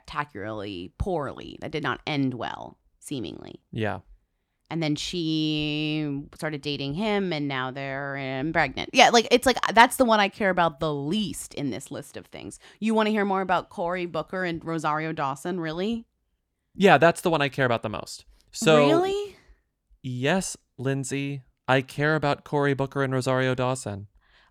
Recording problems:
none

